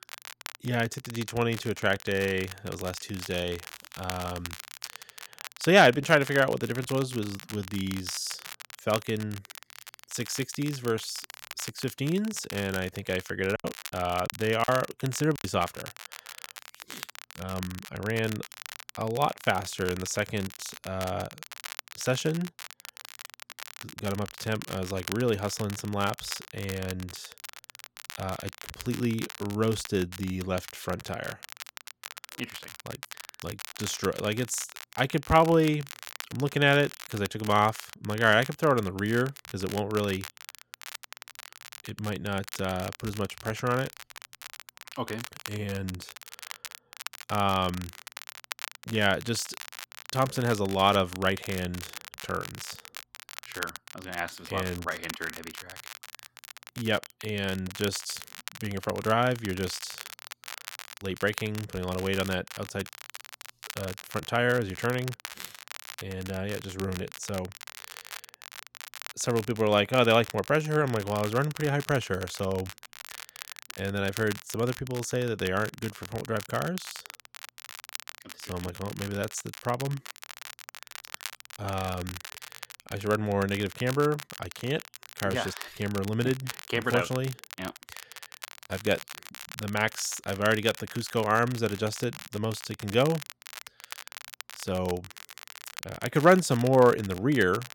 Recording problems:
crackle, like an old record; noticeable; 15 dB below the speech
choppy; very; from 14 to 15 s; 9% of the speech affected

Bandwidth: 17 kHz